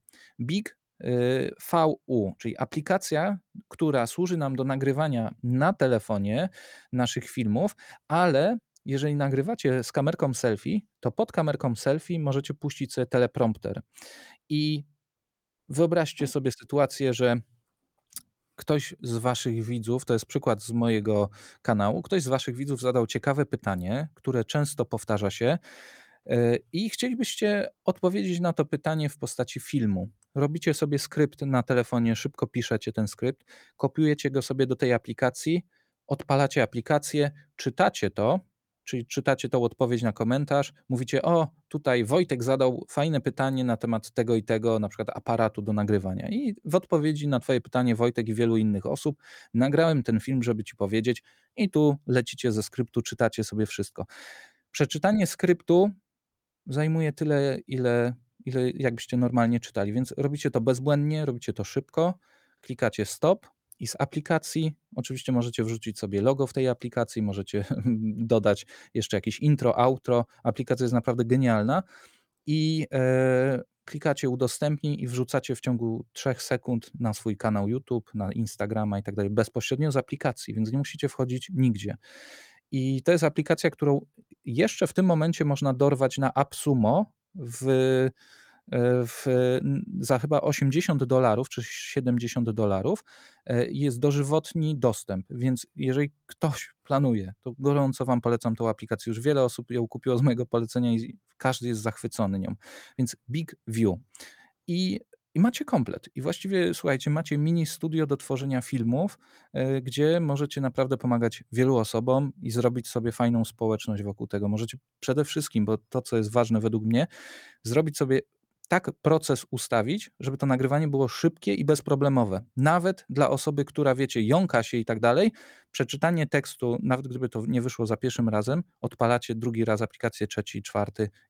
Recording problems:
none

